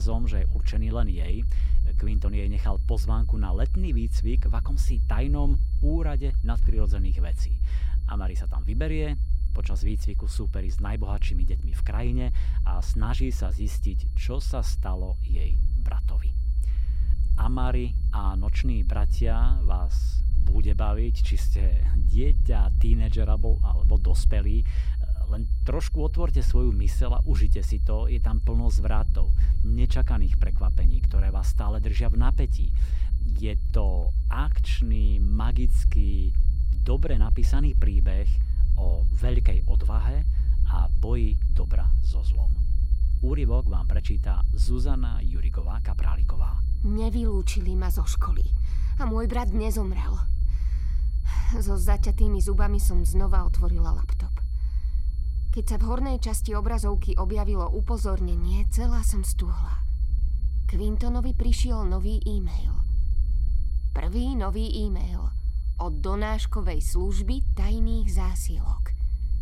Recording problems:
low rumble; noticeable; throughout; 10 dB below the speech
high-pitched whine; faint; throughout; 4.5 kHz, 30 dB below the speech
abrupt cut into speech; at the start

